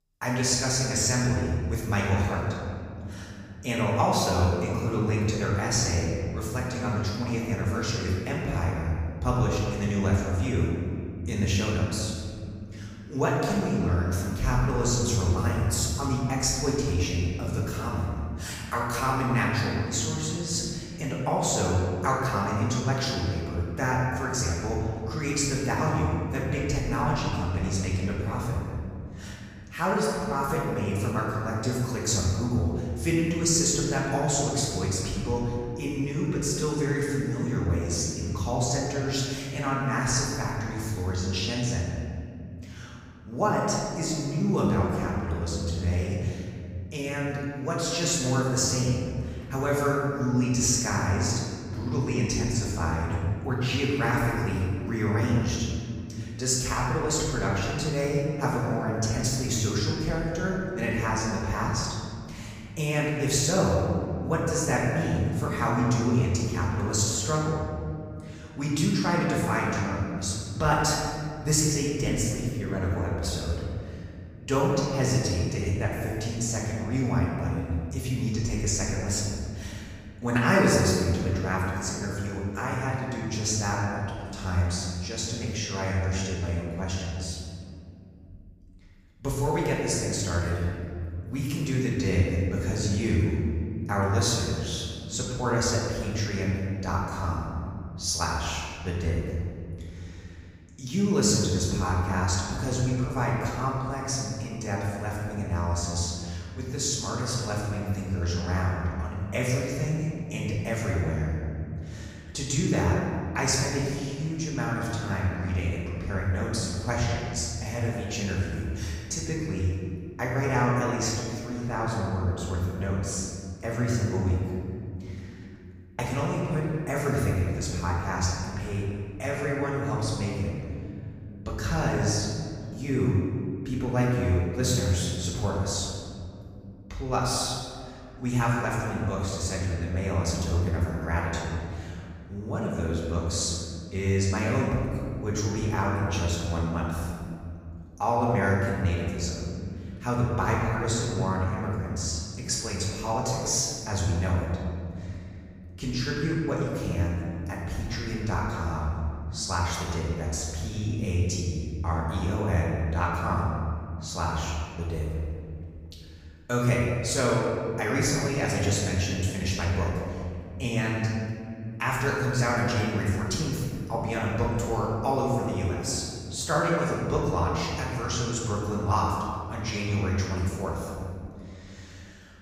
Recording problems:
room echo; strong; dies away in 2.6 s
off-mic speech; far

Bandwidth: 15.5 kHz